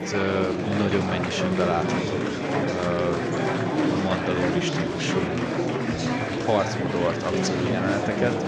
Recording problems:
murmuring crowd; very loud; throughout; 2 dB above the speech

